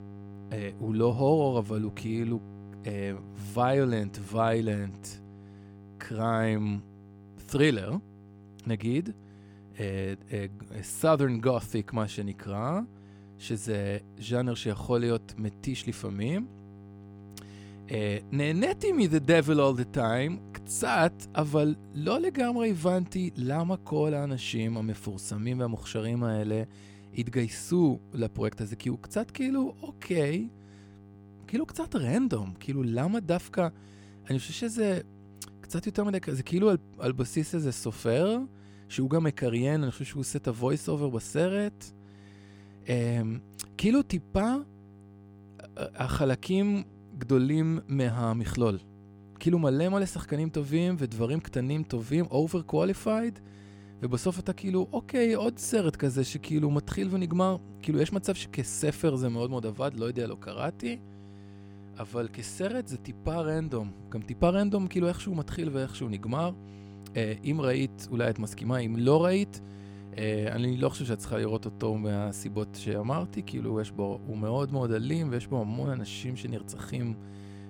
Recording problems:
electrical hum; faint; throughout; 50 Hz, 25 dB below the speech

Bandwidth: 17 kHz